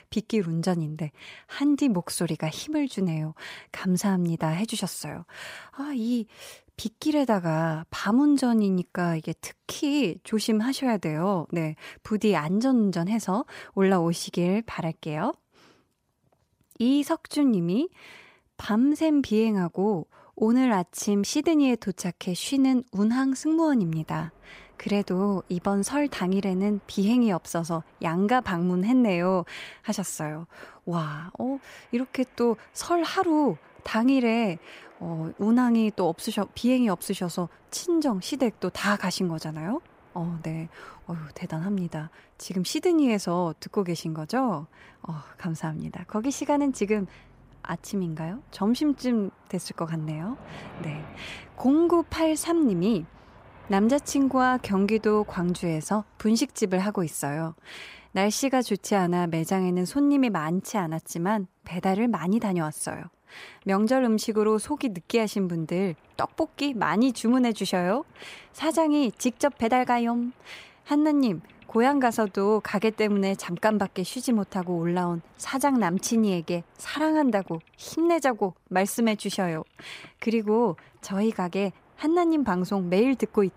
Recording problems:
train or aircraft noise; faint; from 24 s on; 30 dB below the speech

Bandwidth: 15.5 kHz